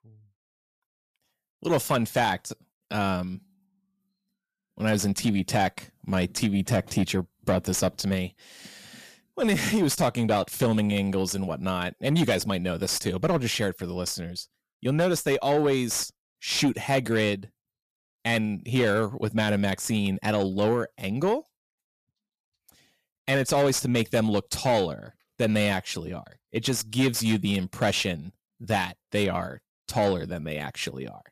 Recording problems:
distortion; slight; 10 dB below the speech

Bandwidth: 14.5 kHz